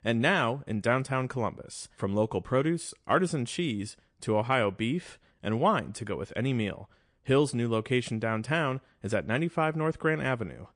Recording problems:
garbled, watery; slightly

